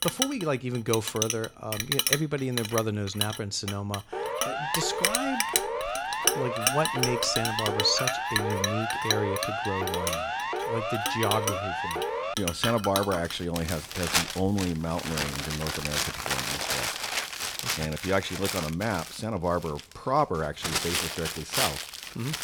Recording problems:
household noises; very loud; throughout; as loud as the speech
siren; loud; from 4 to 12 s; peak level with the speech

